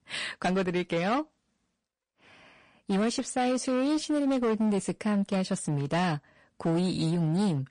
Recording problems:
distortion; slight; 14% of the sound clipped
garbled, watery; slightly; nothing above 10 kHz

